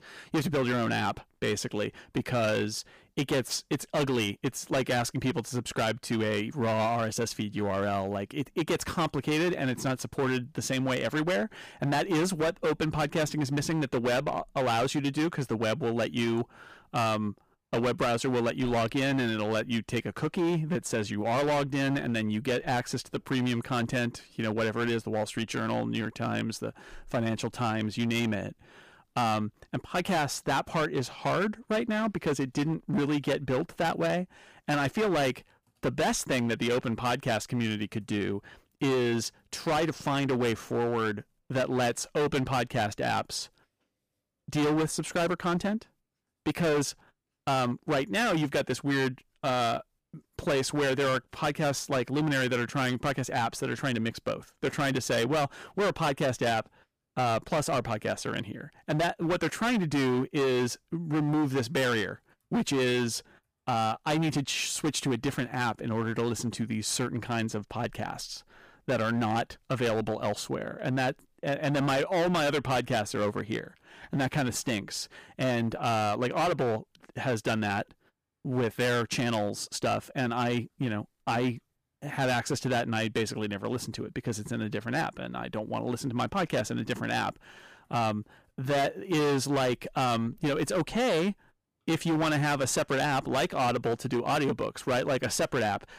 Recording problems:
distortion; heavy; 15% of the sound clipped

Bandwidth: 15 kHz